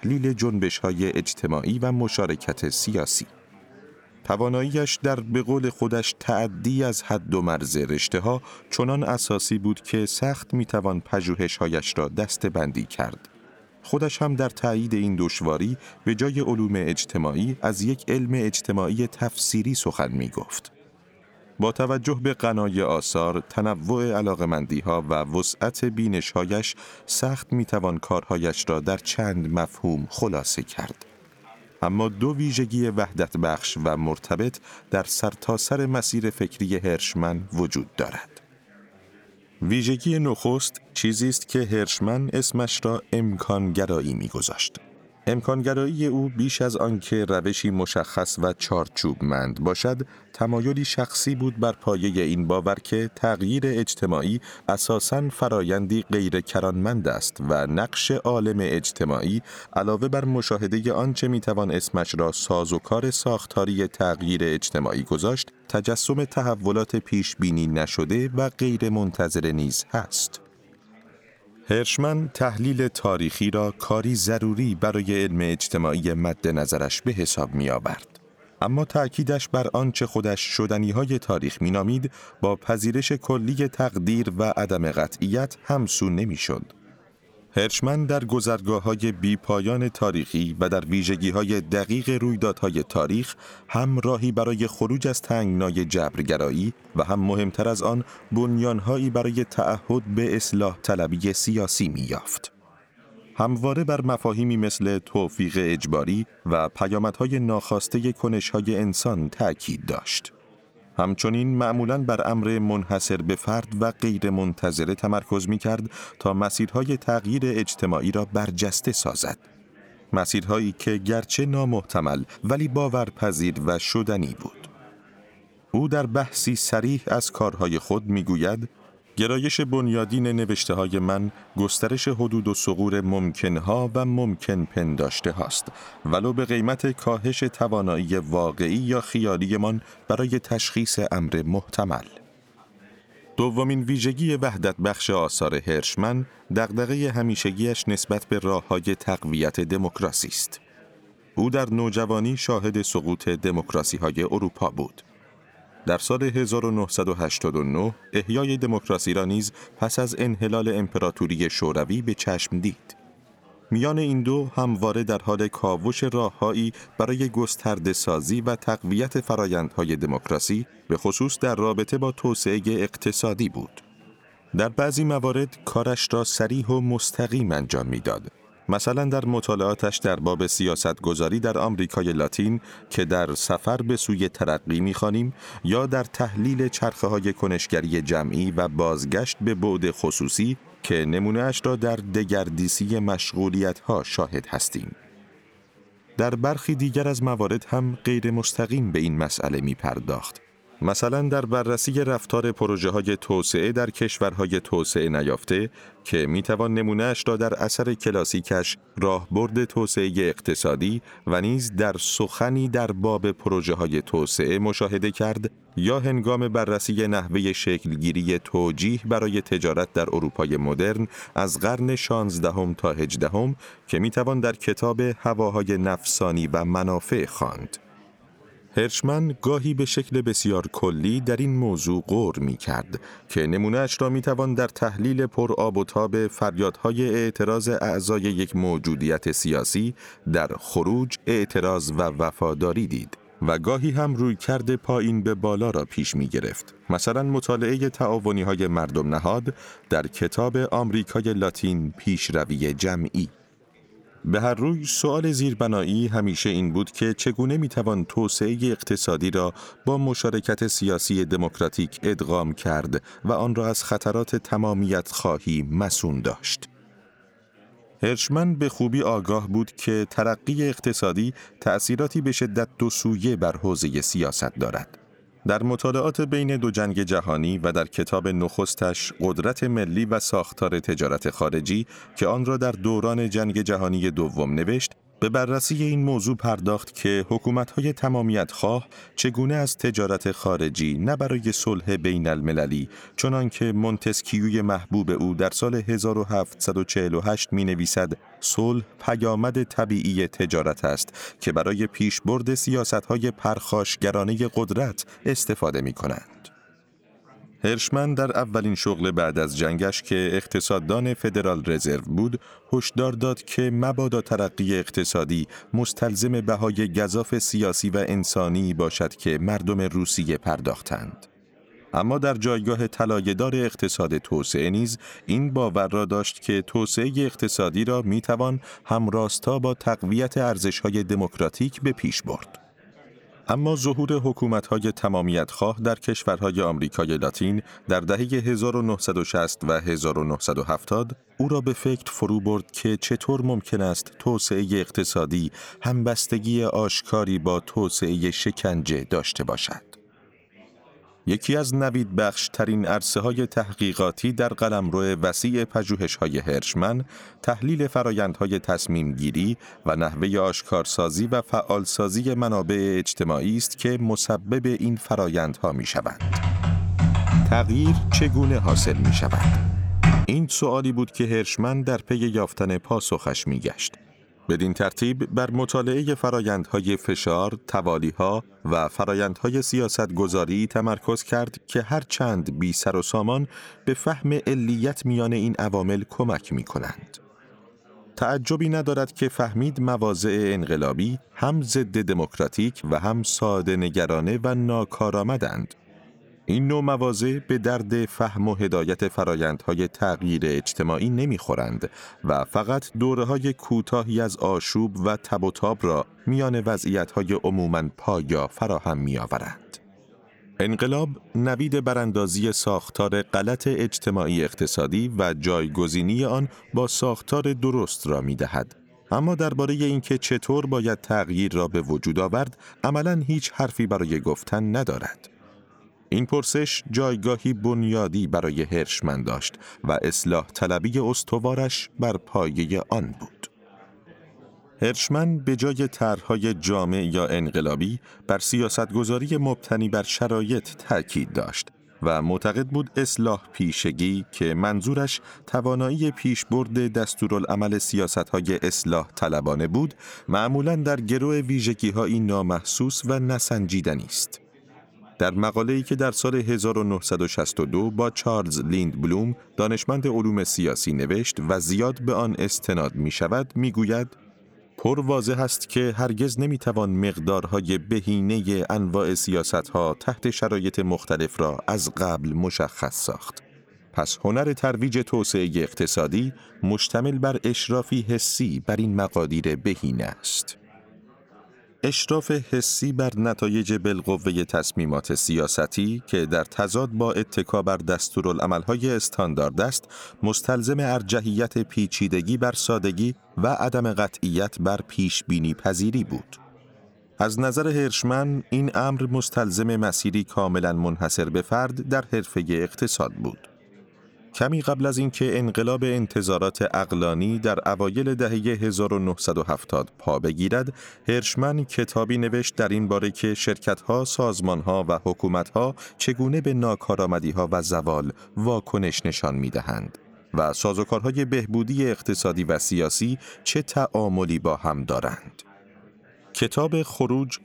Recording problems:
chatter from many people; faint; throughout; 30 dB below the speech
keyboard typing; loud; from 6:06 to 6:10; peak 5 dB above the speech

